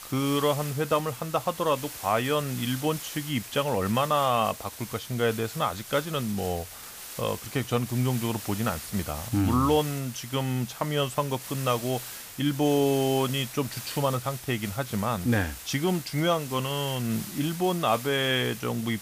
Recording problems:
hiss; noticeable; throughout; 10 dB below the speech

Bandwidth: 15 kHz